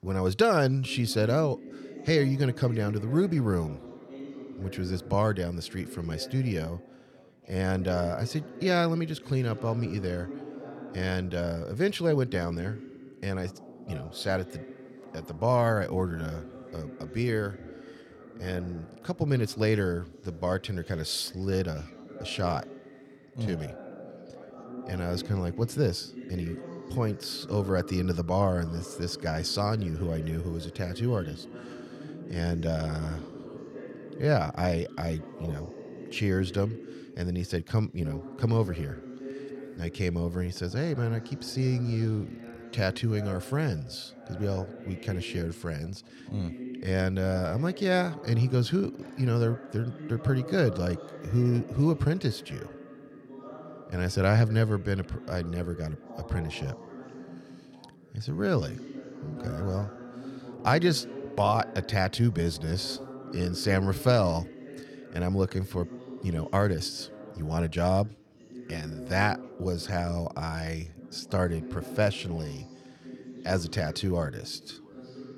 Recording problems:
background chatter; noticeable; throughout; 2 voices, 15 dB below the speech

